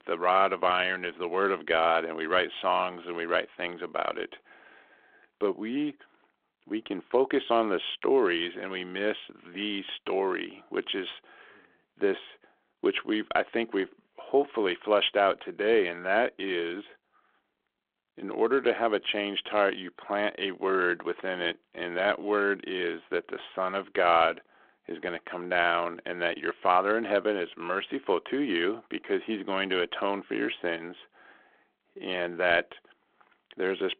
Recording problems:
phone-call audio

